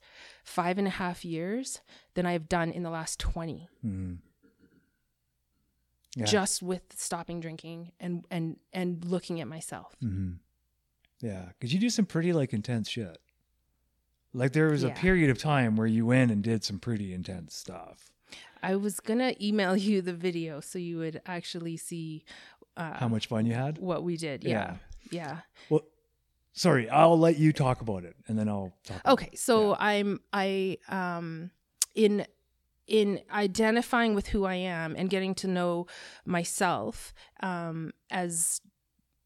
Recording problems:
uneven, jittery; strongly; from 2 to 38 s

